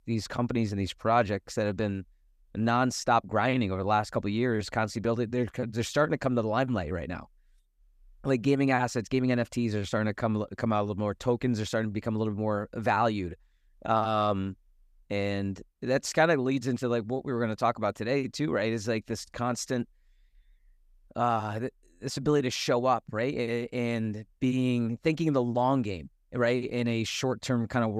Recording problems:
abrupt cut into speech; at the end

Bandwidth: 14.5 kHz